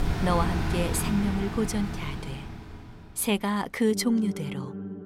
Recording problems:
background music; loud; throughout; 5 dB below the speech

